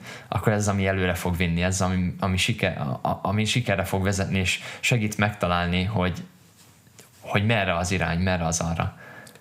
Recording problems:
squashed, flat; somewhat

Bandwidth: 15.5 kHz